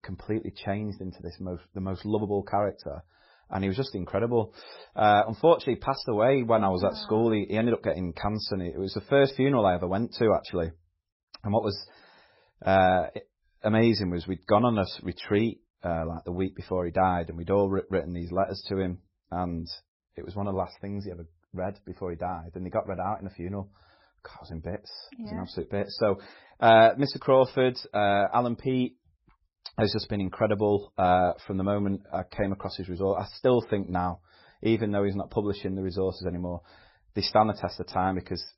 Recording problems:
garbled, watery; badly; nothing above 5.5 kHz

